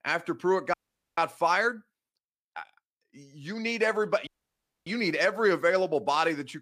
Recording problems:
audio cutting out; at 0.5 s and at 4.5 s for 0.5 s

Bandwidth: 15 kHz